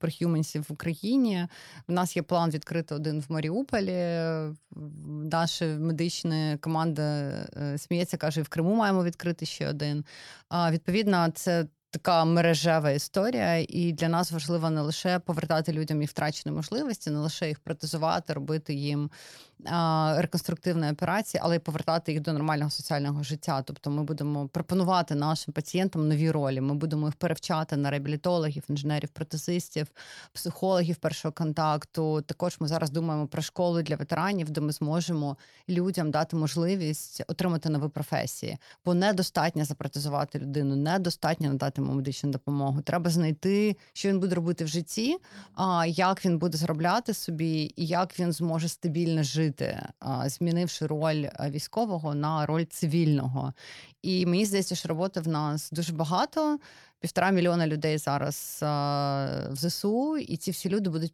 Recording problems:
none

